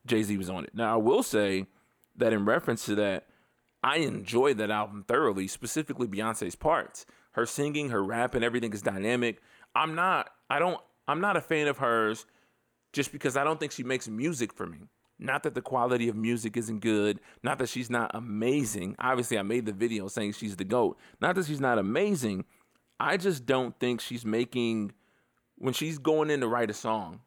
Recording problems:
none

